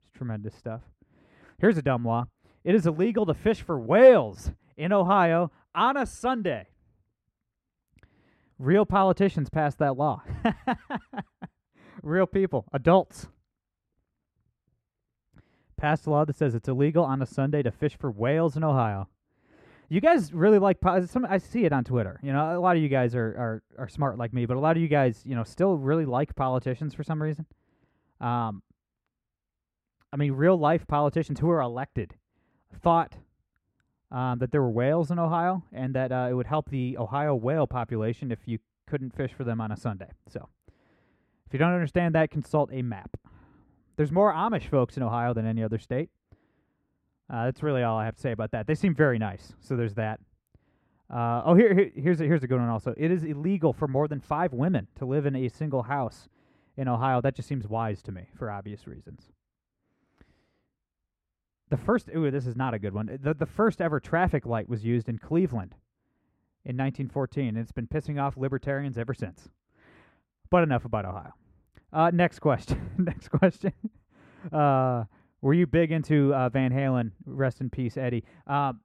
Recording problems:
muffled; very; fading above 3 kHz

